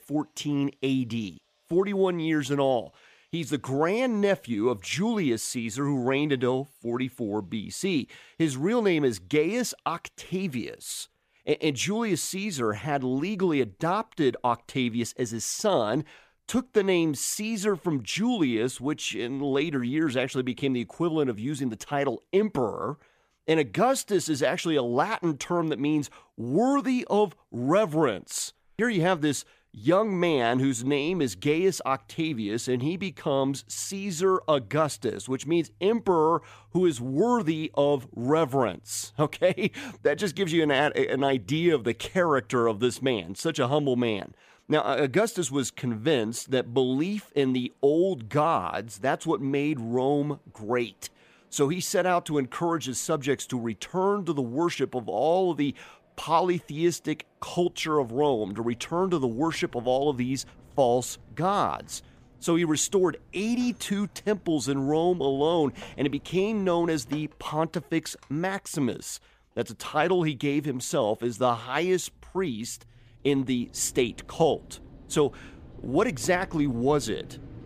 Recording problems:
machinery noise; faint; throughout; 25 dB below the speech

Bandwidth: 15 kHz